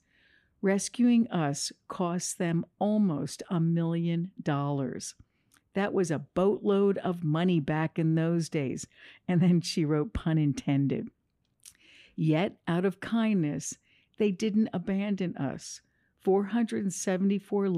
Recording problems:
abrupt cut into speech; at the end

